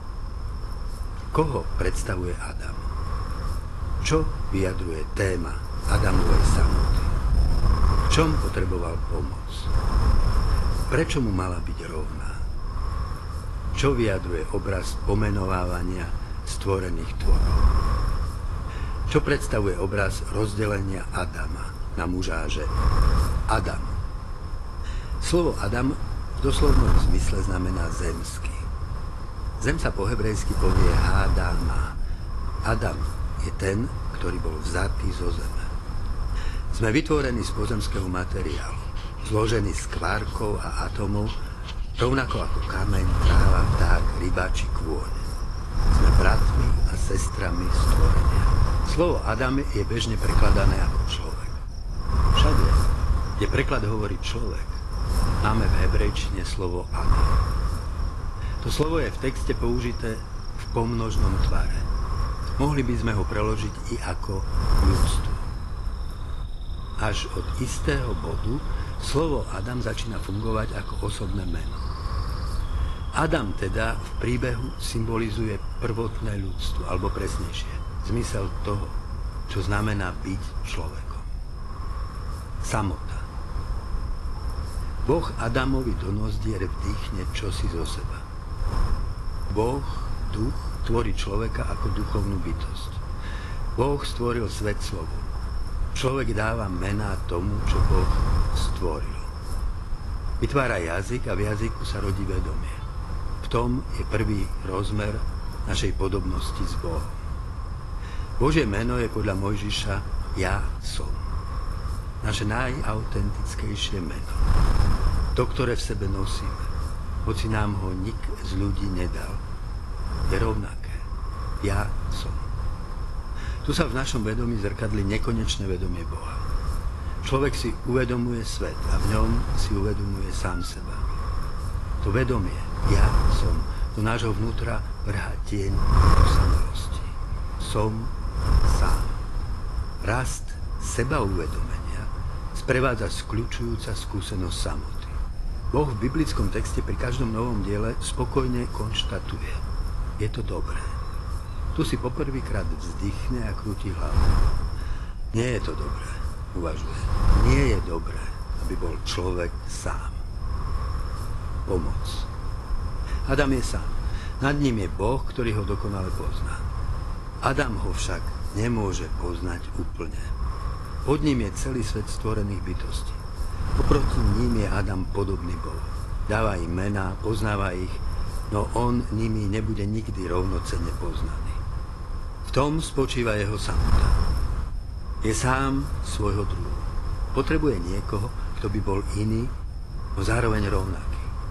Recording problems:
garbled, watery; slightly; nothing above 11.5 kHz
wind noise on the microphone; heavy; 7 dB below the speech
animal sounds; faint; throughout; 25 dB below the speech

